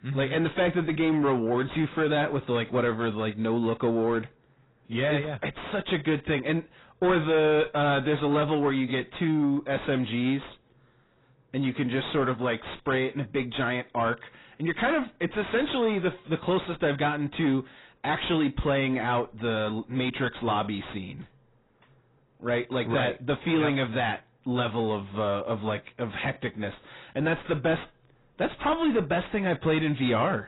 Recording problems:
distortion; heavy; 7 dB below the speech
garbled, watery; badly; nothing above 4 kHz

